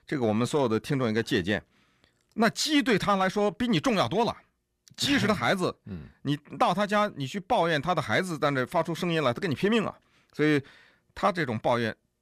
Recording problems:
none

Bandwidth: 15 kHz